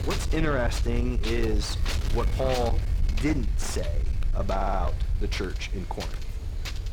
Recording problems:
distortion; slight; 10 dB below the speech
wind noise on the microphone; heavy; 9 dB below the speech
low rumble; noticeable; throughout; 15 dB below the speech
audio stuttering; at 4.5 s

